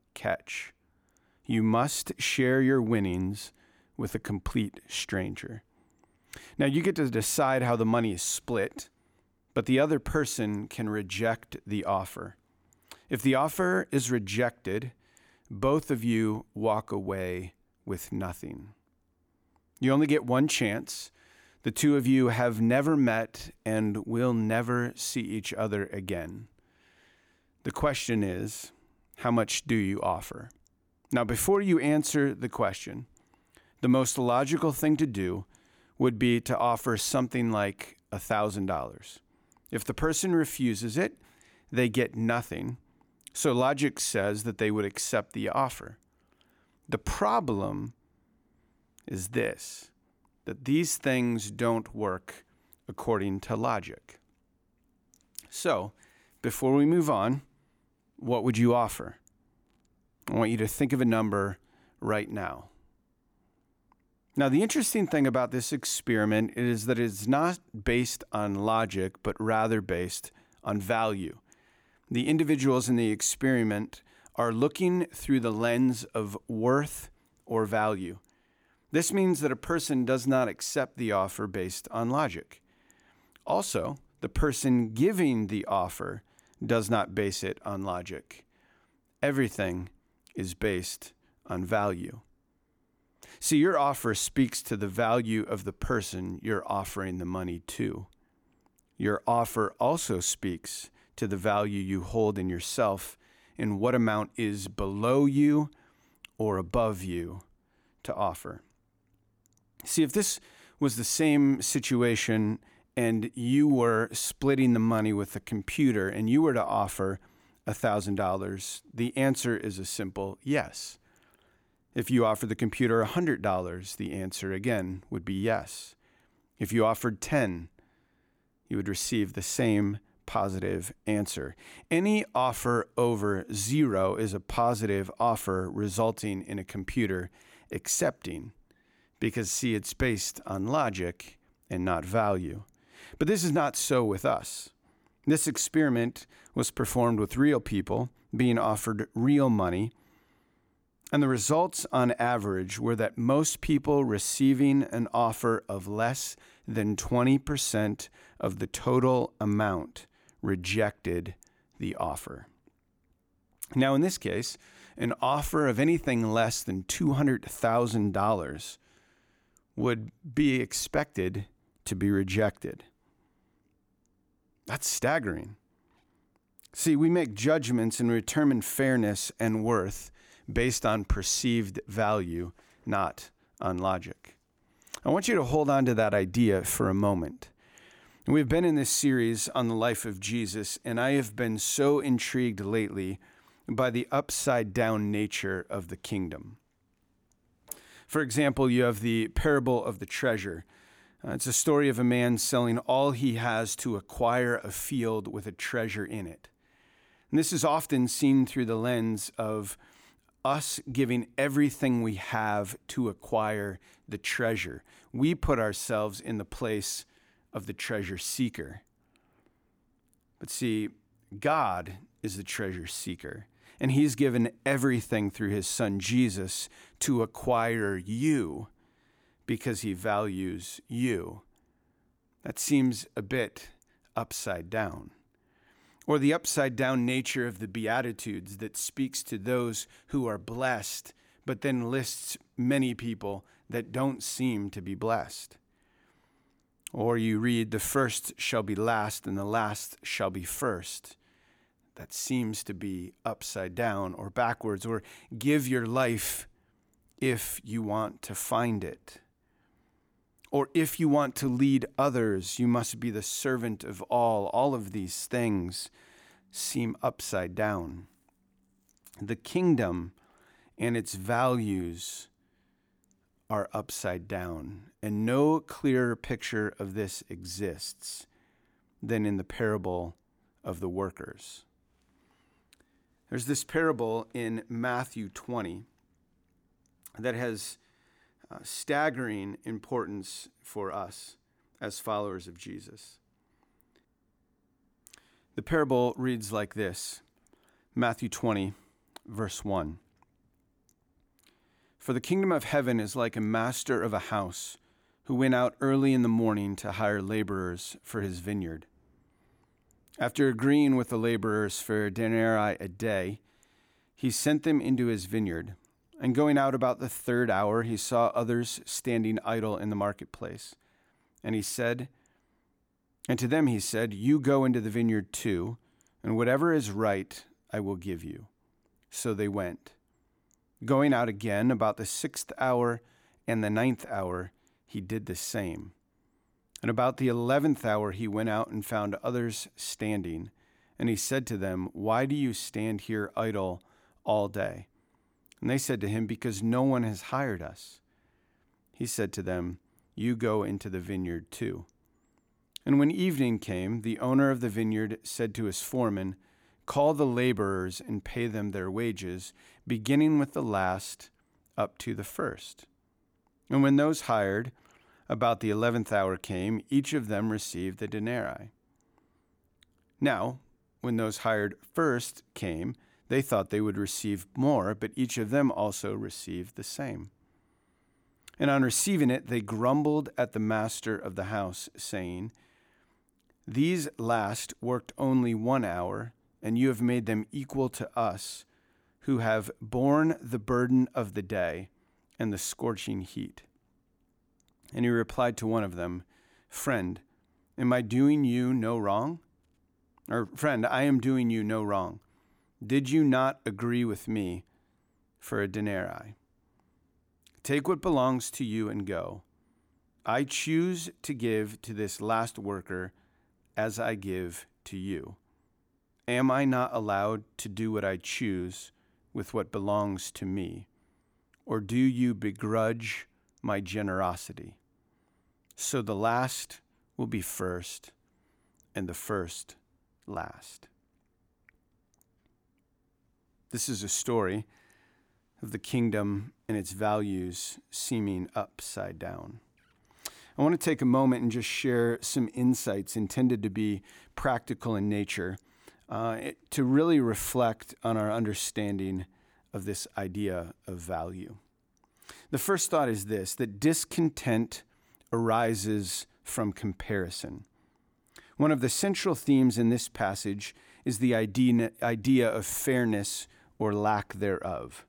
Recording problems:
none

